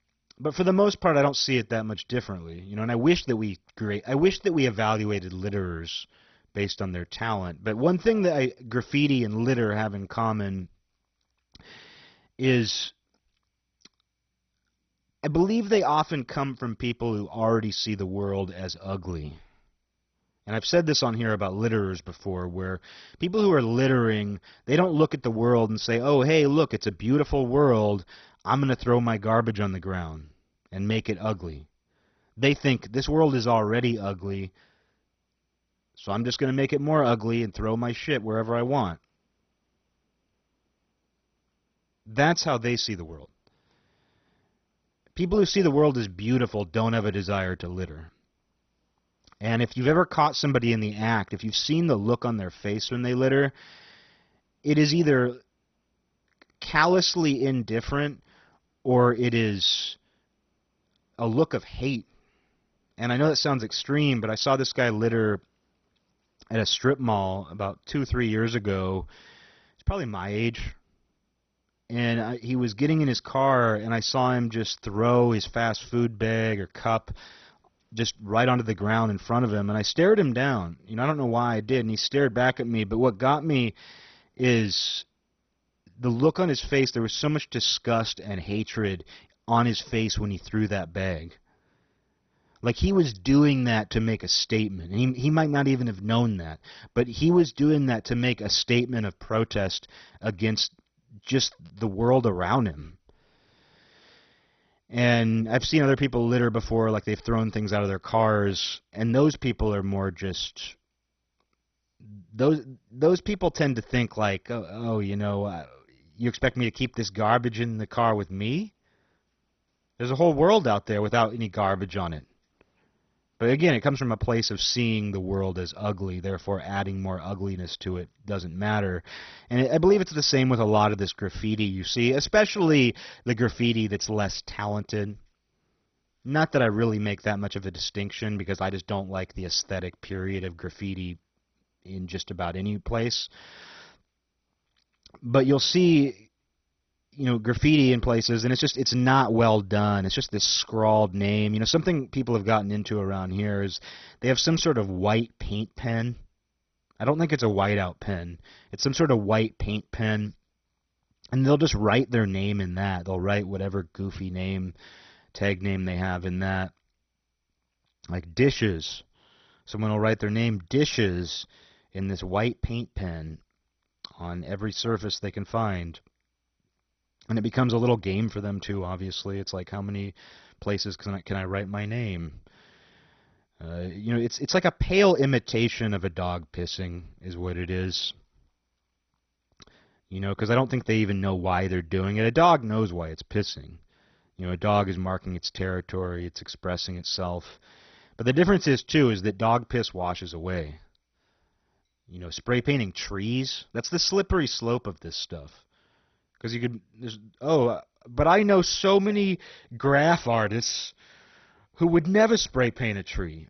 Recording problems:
garbled, watery; badly; nothing above 6 kHz

